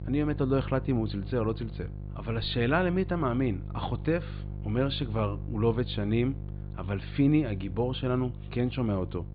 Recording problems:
high frequencies cut off; severe; nothing above 4.5 kHz
electrical hum; noticeable; throughout; 50 Hz, 20 dB below the speech

